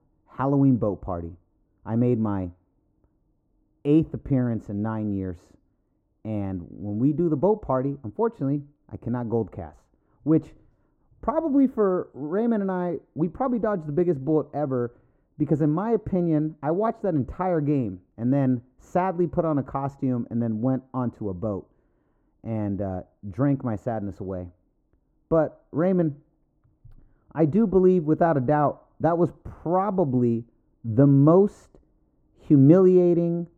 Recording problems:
muffled; very; fading above 1 kHz

